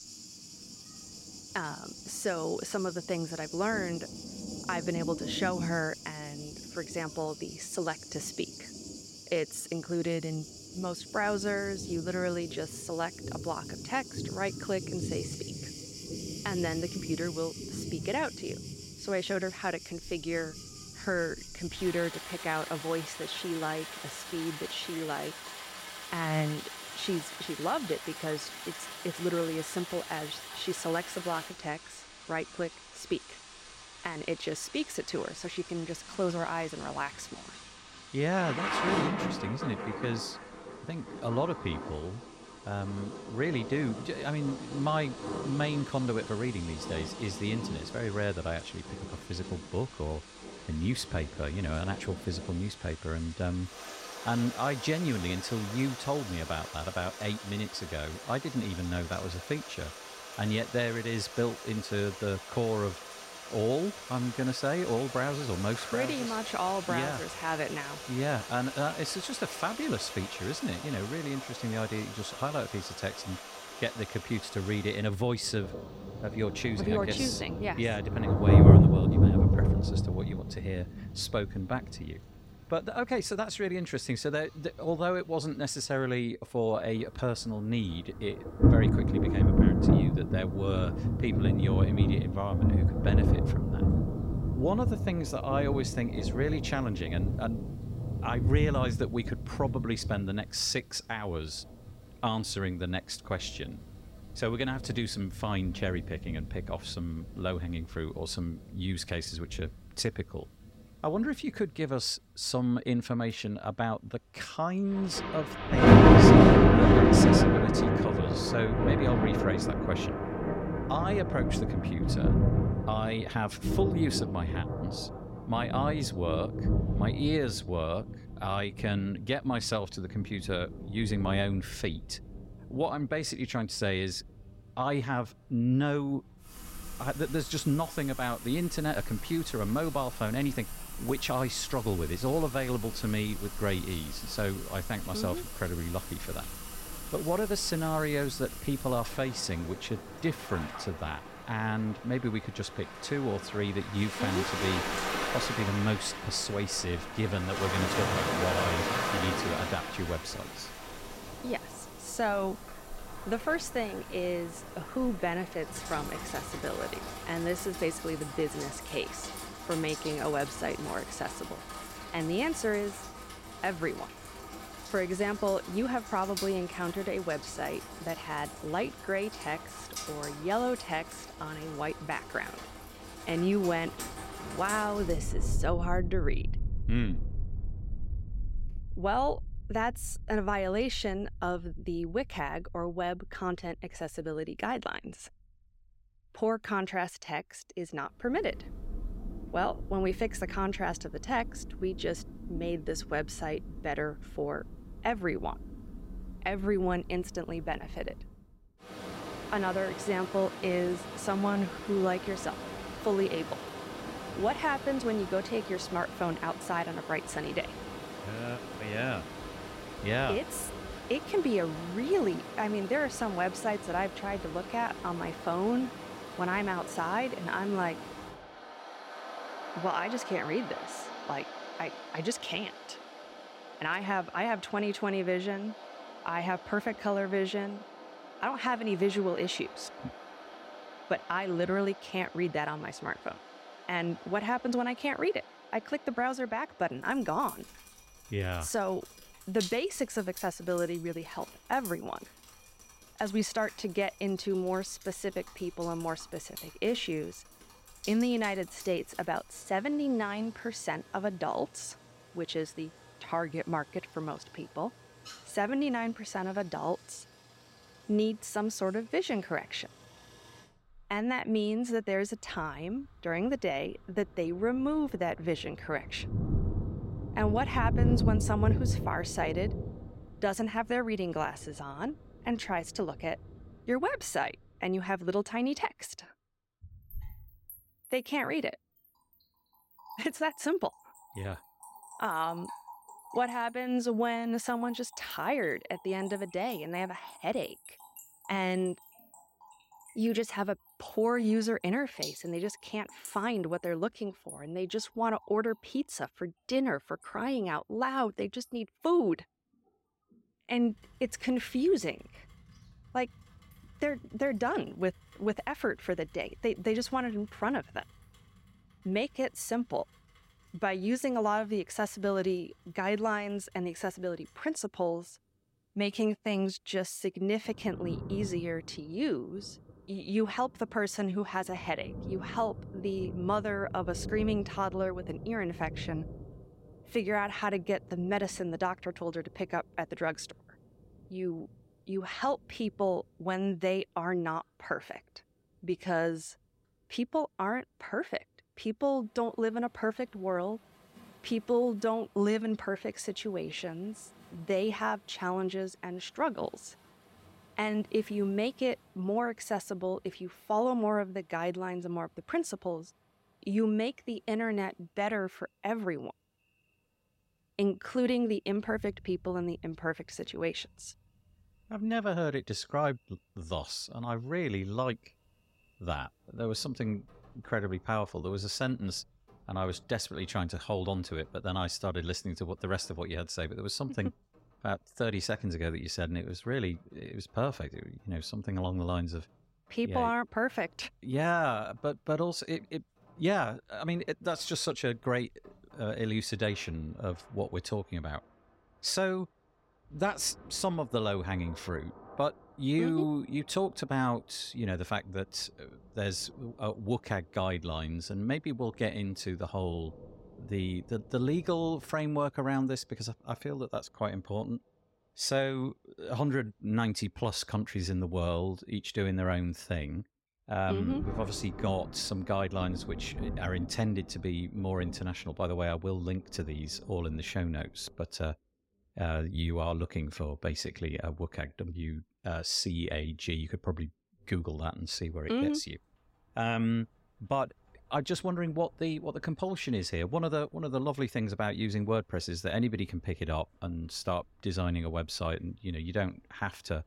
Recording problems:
rain or running water; very loud; throughout; 1 dB above the speech

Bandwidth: 16 kHz